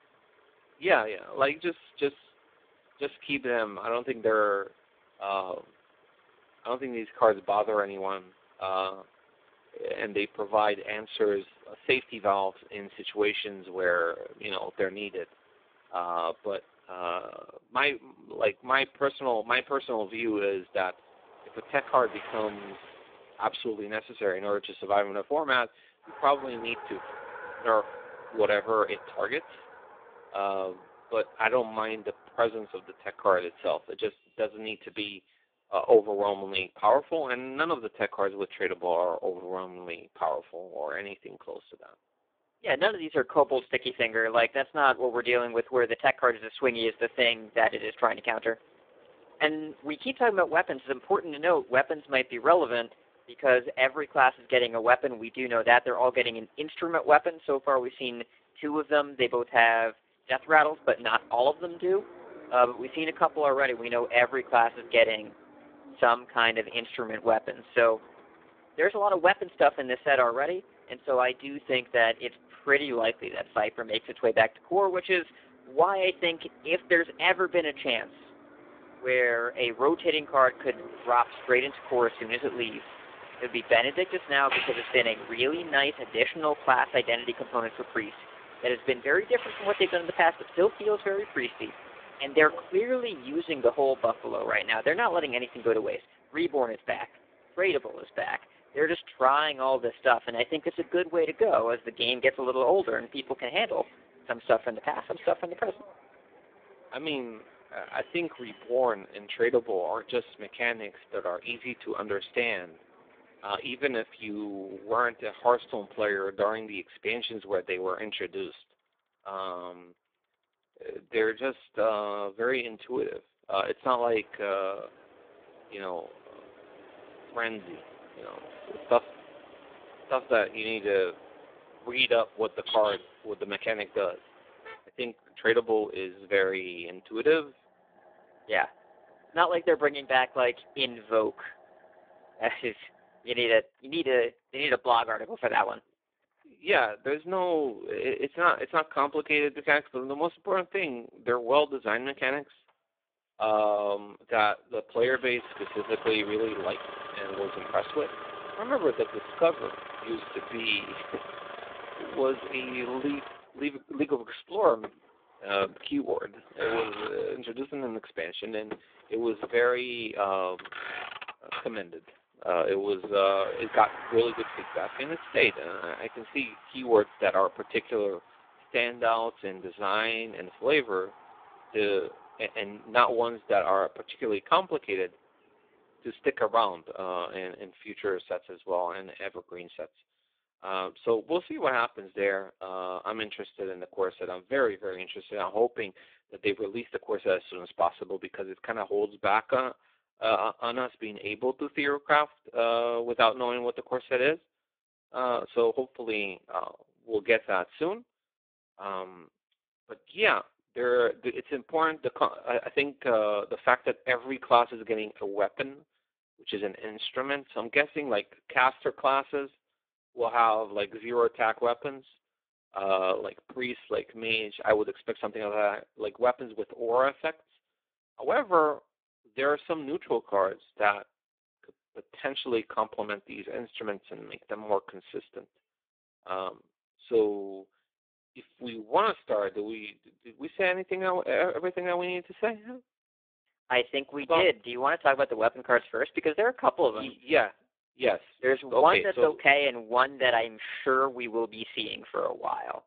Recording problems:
phone-call audio; poor line
traffic noise; noticeable; until 3:07; 15 dB below the speech

